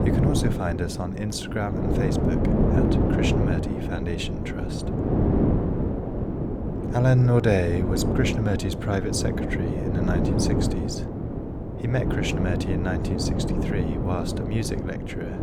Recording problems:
wind noise on the microphone; heavy; as loud as the speech

